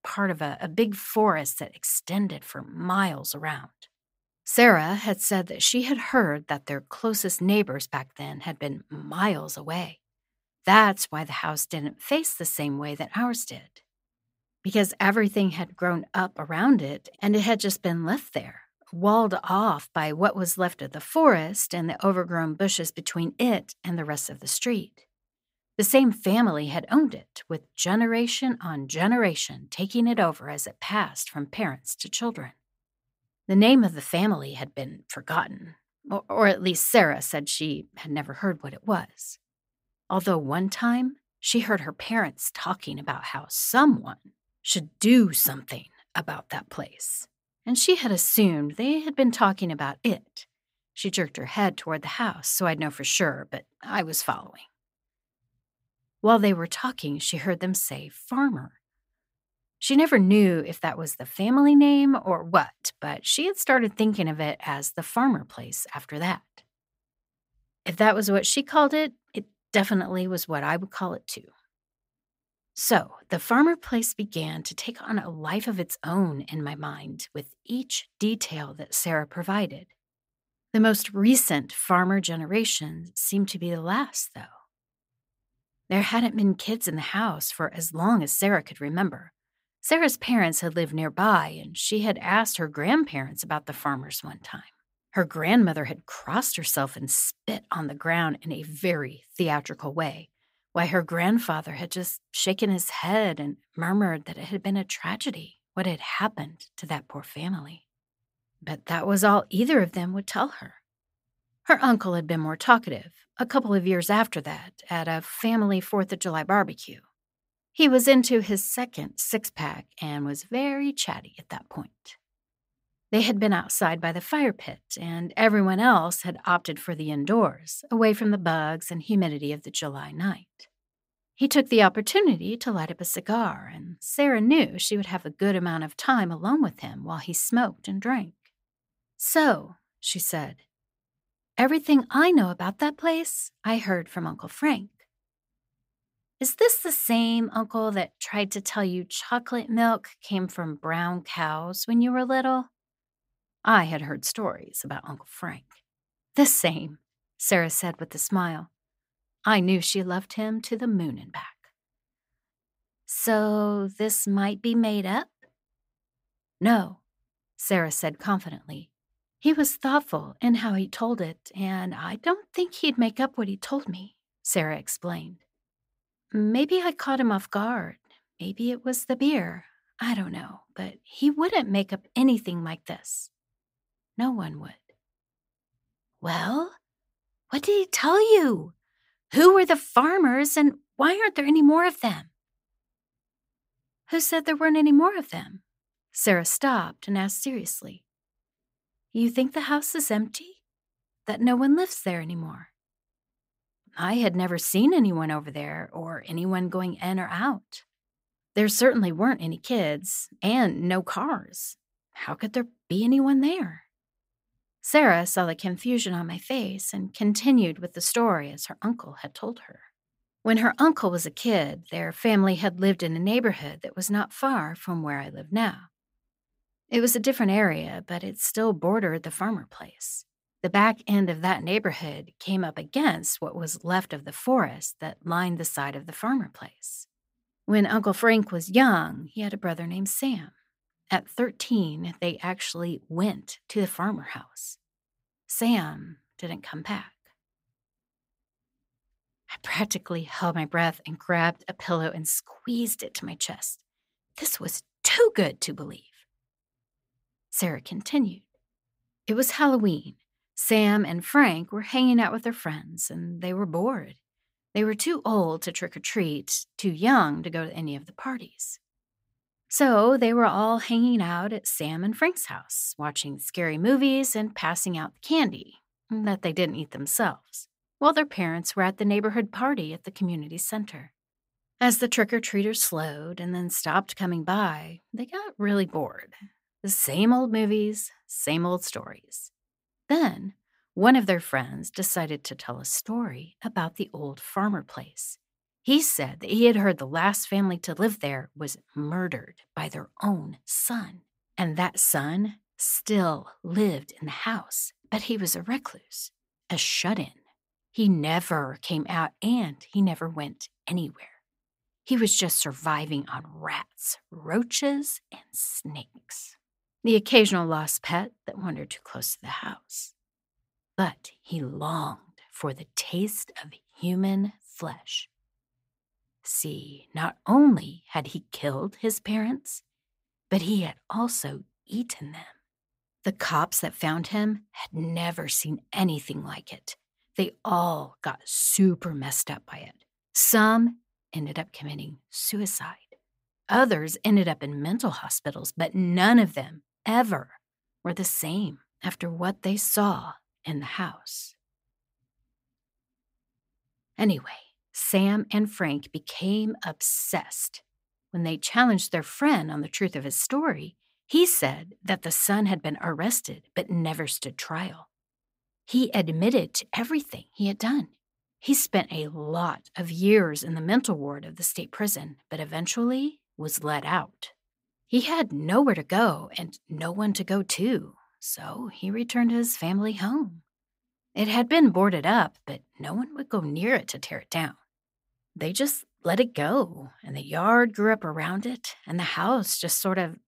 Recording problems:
none

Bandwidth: 15.5 kHz